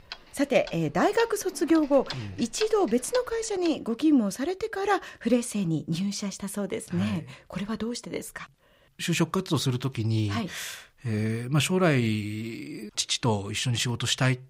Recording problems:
household noises; noticeable; until 3.5 s; 15 dB below the speech

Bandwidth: 15.5 kHz